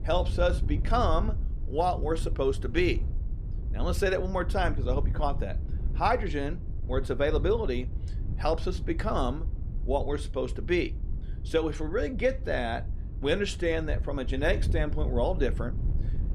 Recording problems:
wind noise on the microphone; occasional gusts; 20 dB below the speech

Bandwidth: 13.5 kHz